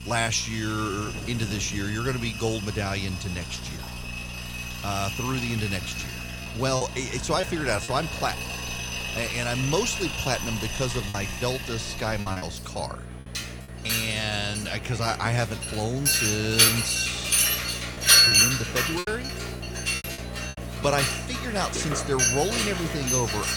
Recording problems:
machinery noise; very loud; throughout; 3 dB above the speech
rain or running water; noticeable; until 19 s; 15 dB below the speech
electrical hum; faint; throughout; 60 Hz, 20 dB below the speech
high-pitched whine; faint; throughout; 9.5 kHz, 30 dB below the speech
choppy; very; from 7 to 8 s, from 11 to 12 s and from 17 to 19 s; 6% of the speech affected

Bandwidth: 18.5 kHz